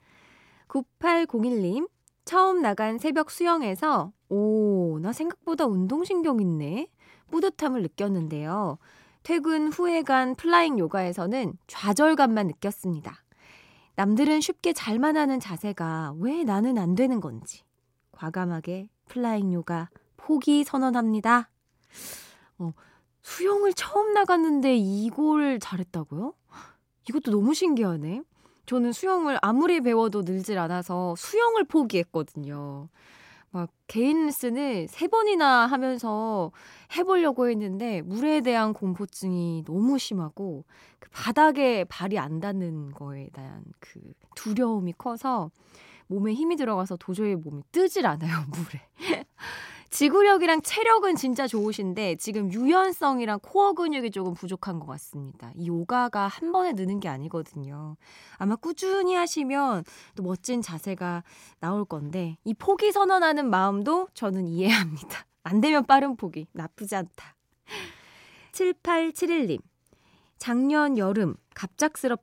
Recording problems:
none

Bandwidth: 16 kHz